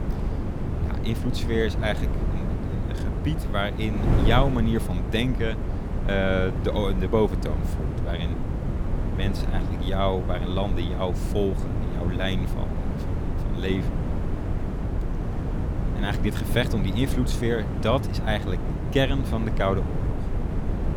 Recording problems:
wind noise on the microphone; heavy; 7 dB below the speech

